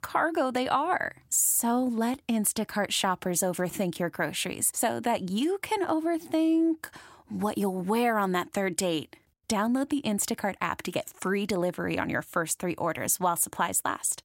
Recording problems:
none

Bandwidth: 16 kHz